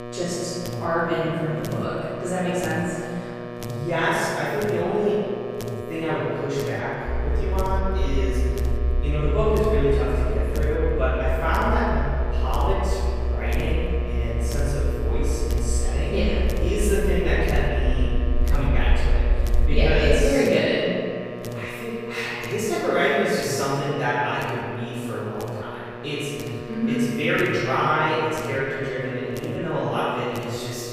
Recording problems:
room echo; strong; dies away in 2.1 s
off-mic speech; far
electrical hum; noticeable; throughout; 60 Hz, 10 dB below the speech
low rumble; faint; from 7 to 20 s; 20 dB below the speech

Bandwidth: 15 kHz